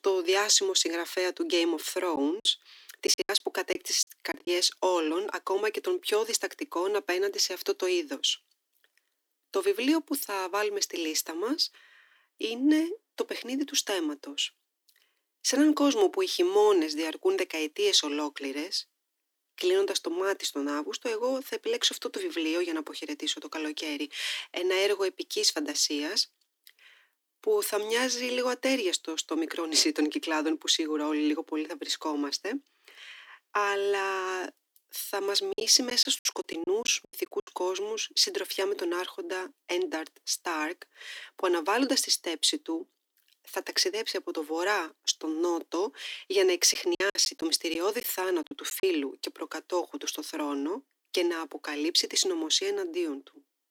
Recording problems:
thin; somewhat; fading below 300 Hz
choppy; very; from 2 to 4.5 s, from 36 to 37 s and from 47 to 49 s; 17% of the speech affected

